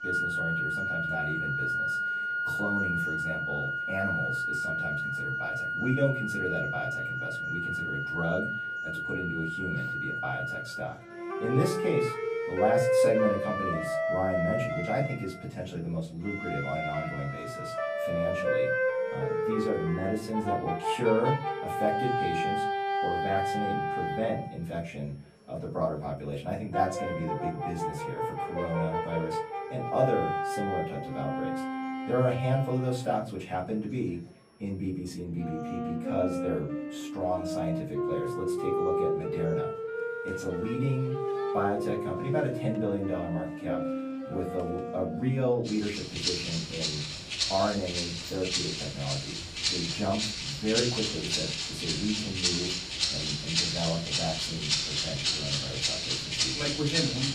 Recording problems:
off-mic speech; far
room echo; slight; dies away in 0.3 s
background music; very loud; throughout; 2 dB above the speech
high-pitched whine; faint; from 11 to 35 s; 5.5 kHz, 35 dB below the speech
murmuring crowd; faint; throughout; 25 dB below the speech

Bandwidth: 15 kHz